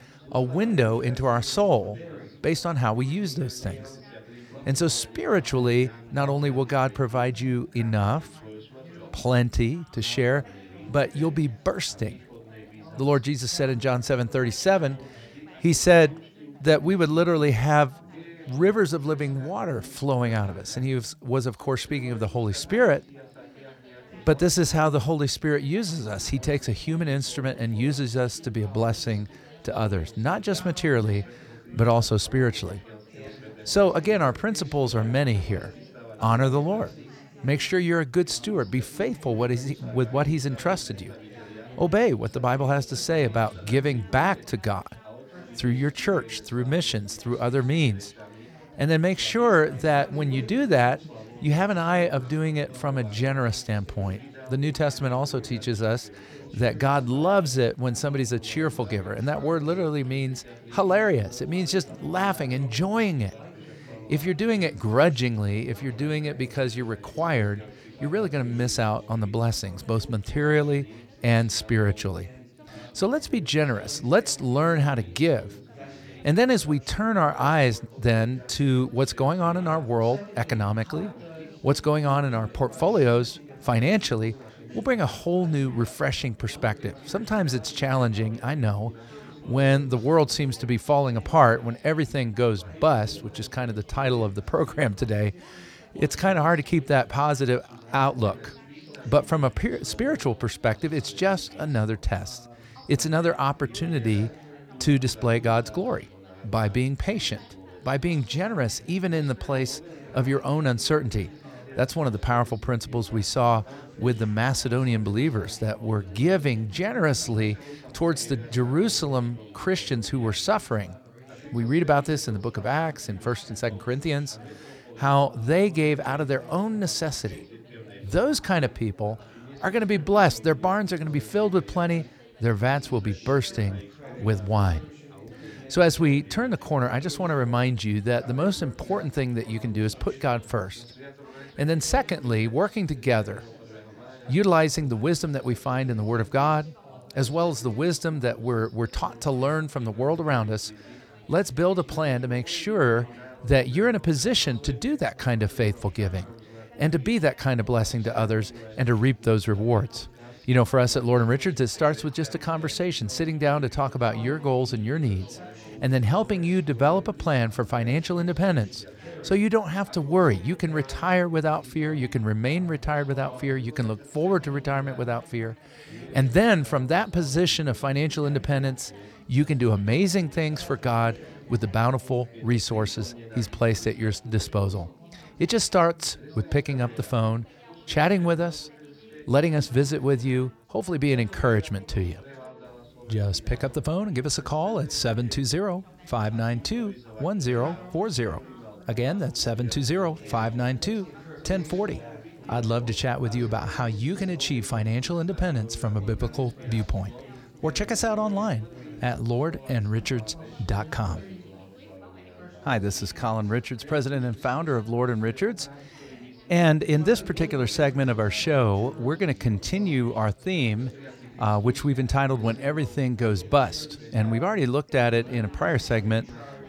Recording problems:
background chatter; noticeable; throughout; 4 voices, 20 dB below the speech

